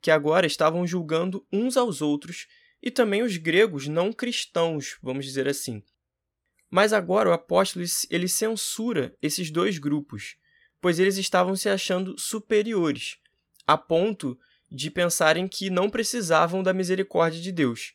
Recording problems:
none

